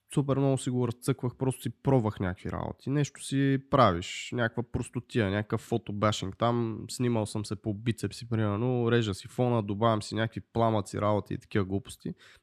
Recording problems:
none

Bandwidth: 13.5 kHz